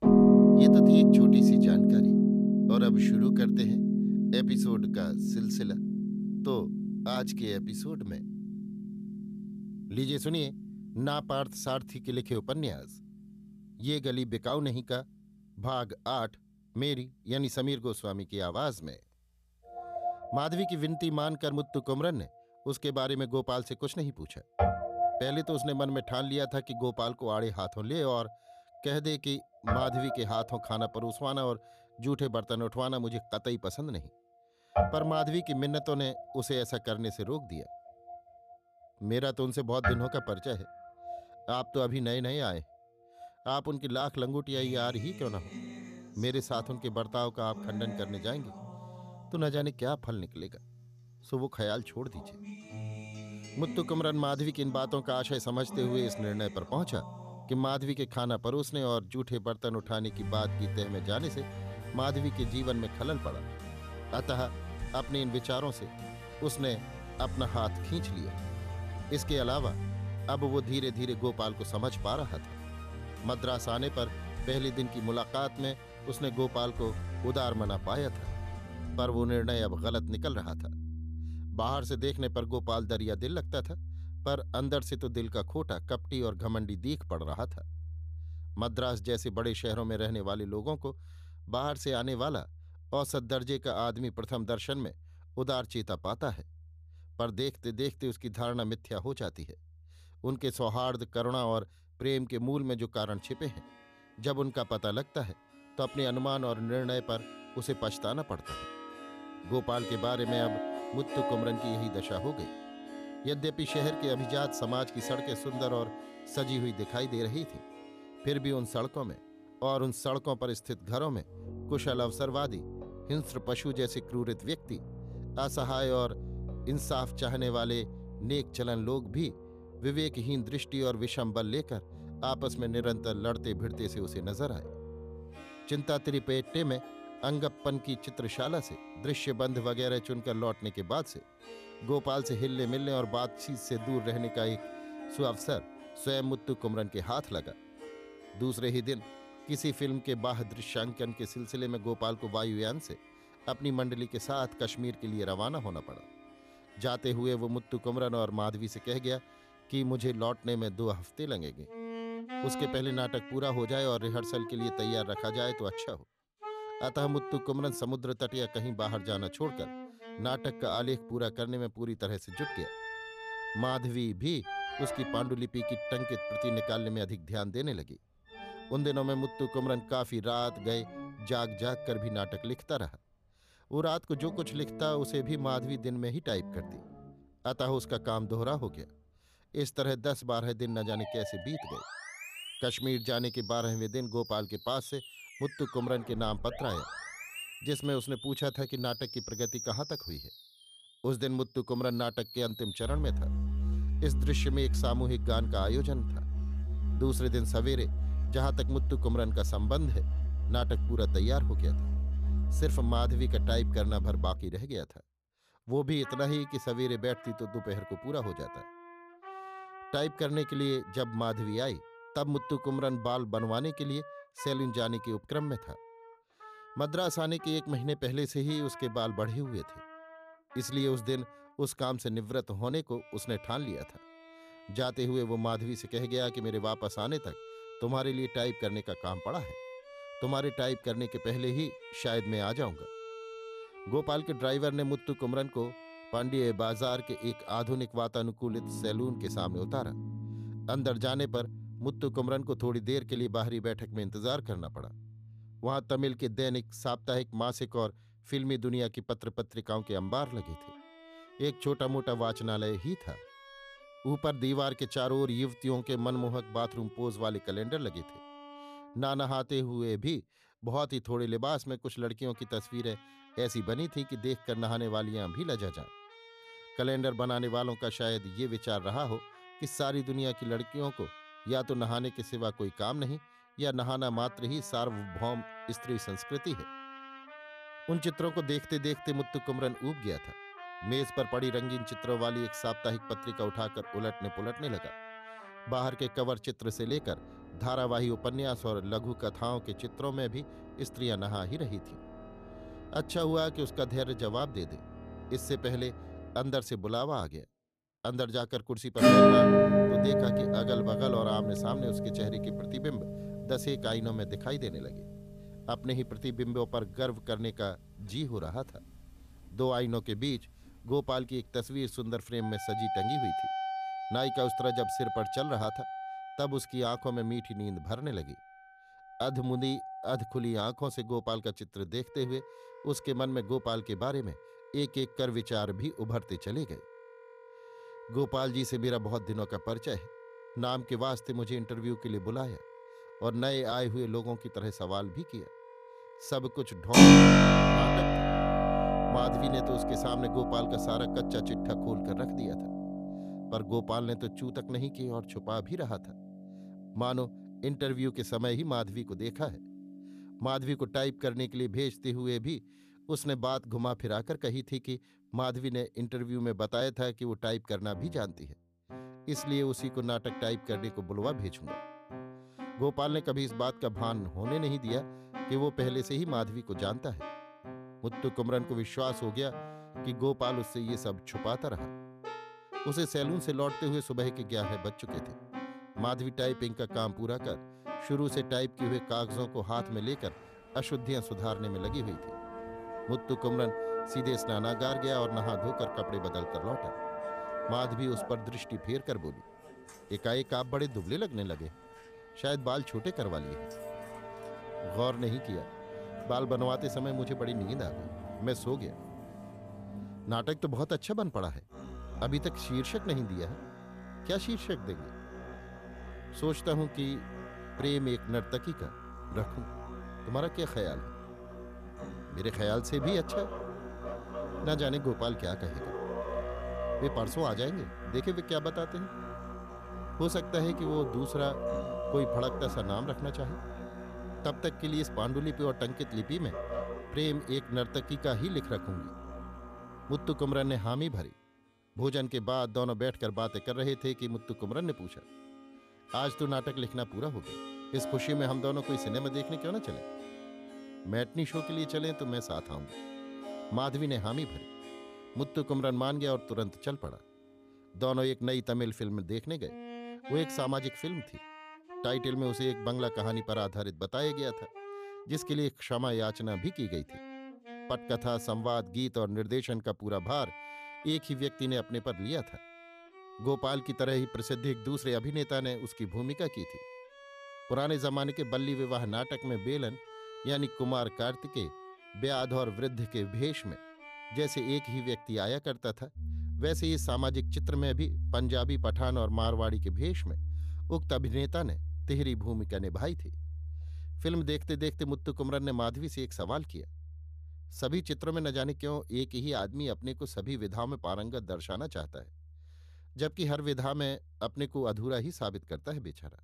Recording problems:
background music; very loud; throughout; as loud as the speech

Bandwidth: 14.5 kHz